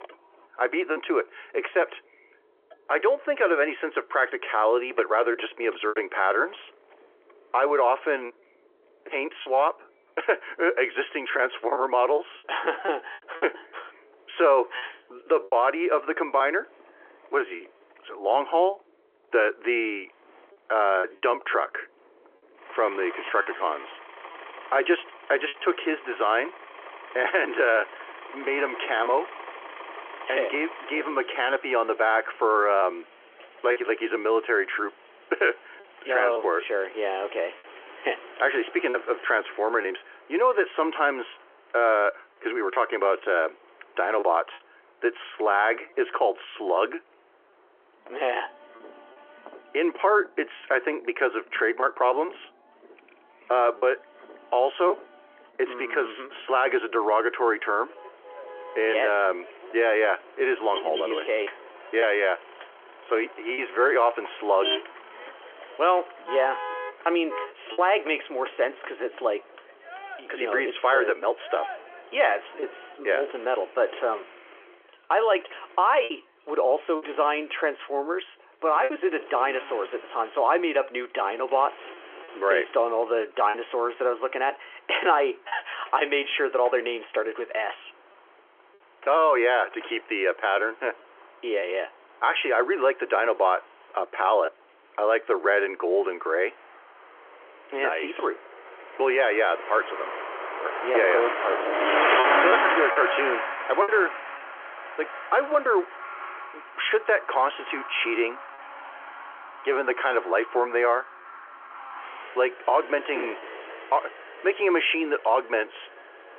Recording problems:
phone-call audio; nothing above 3.5 kHz
traffic noise; loud; throughout; 8 dB below the speech
choppy; occasionally; 2% of the speech affected

